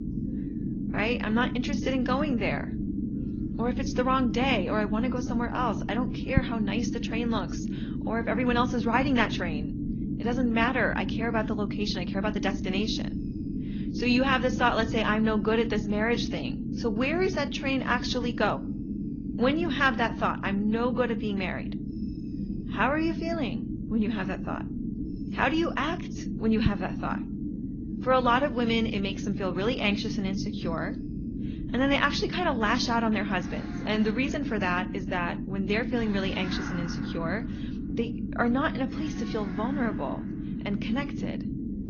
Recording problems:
garbled, watery; slightly; nothing above 6.5 kHz
low rumble; noticeable; throughout; 10 dB below the speech
animal sounds; faint; throughout; 20 dB below the speech

